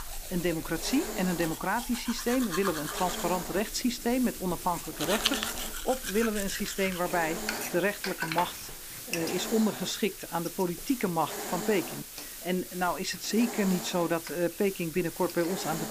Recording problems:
household noises; loud; throughout; 7 dB below the speech
hiss; loud; throughout; 8 dB below the speech

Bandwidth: 15 kHz